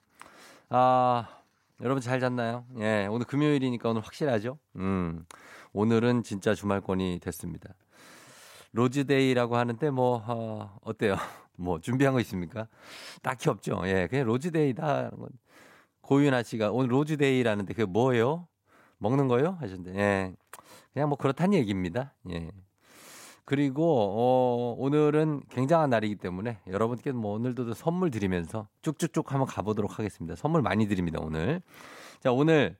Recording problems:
none

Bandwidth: 16 kHz